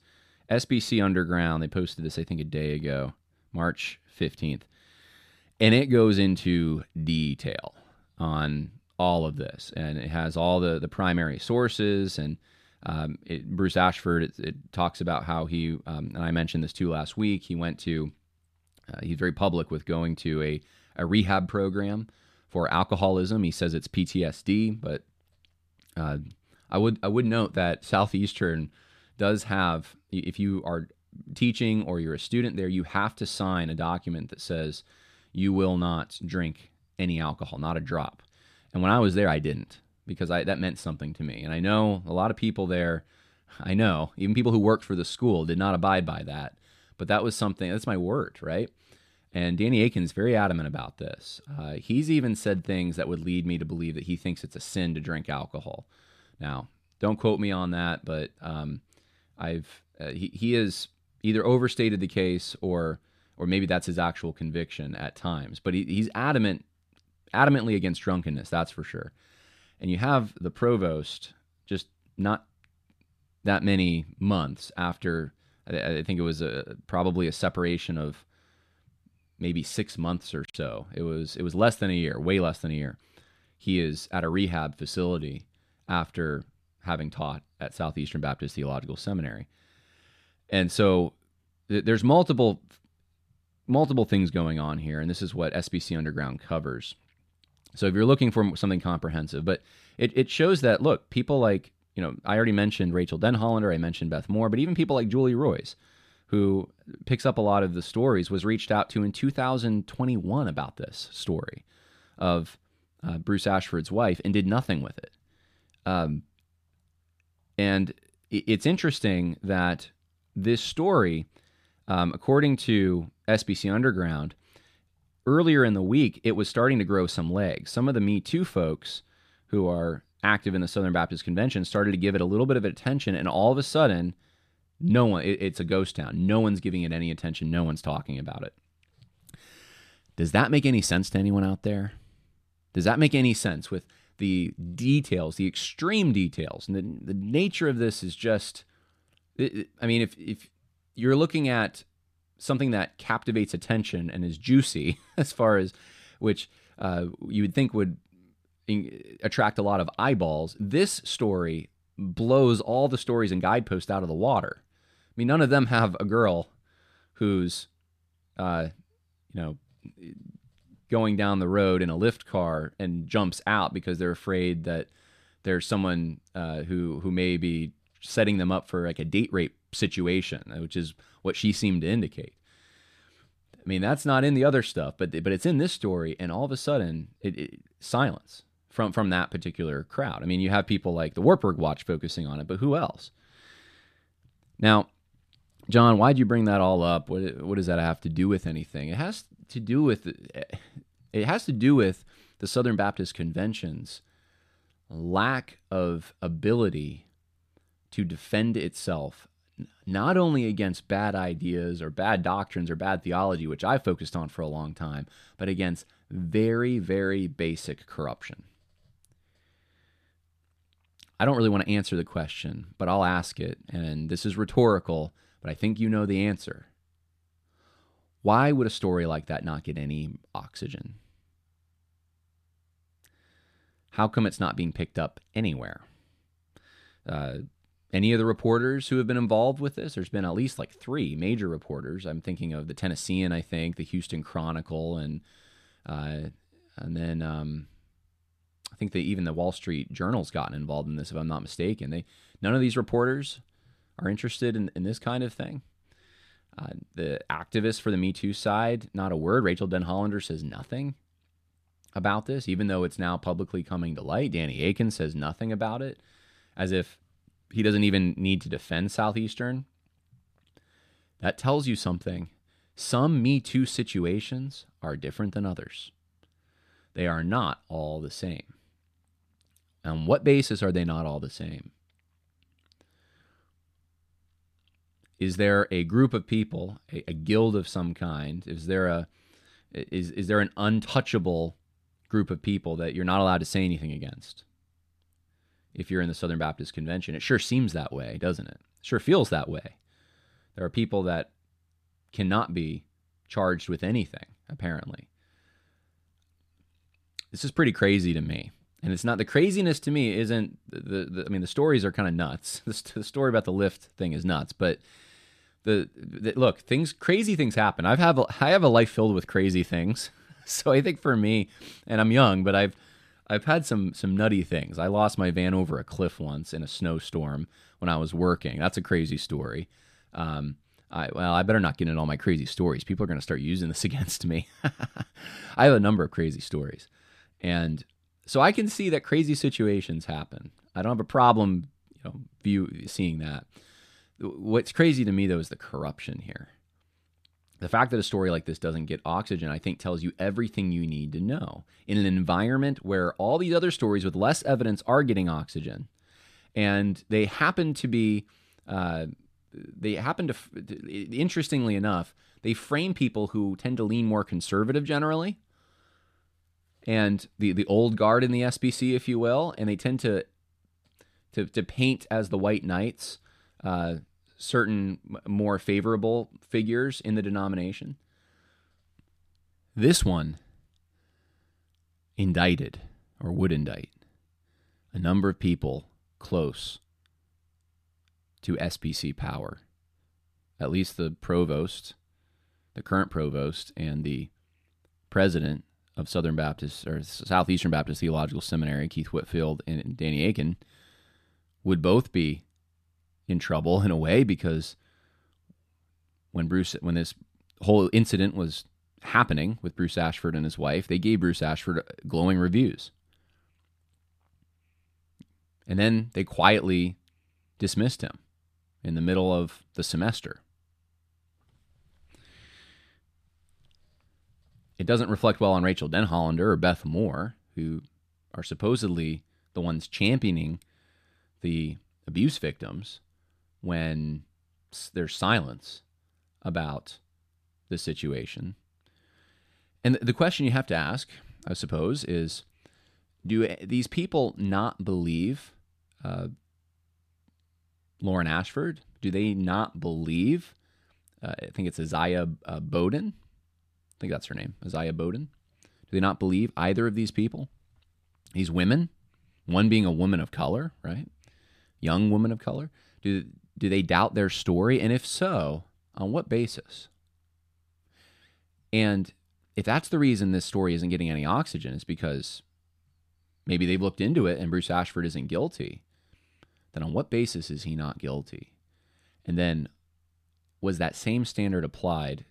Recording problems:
none

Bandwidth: 14.5 kHz